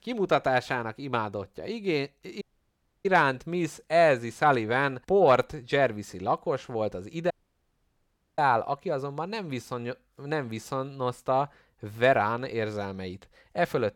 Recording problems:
audio cutting out; at 2.5 s for 0.5 s and at 7.5 s for 1 s

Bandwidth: 18 kHz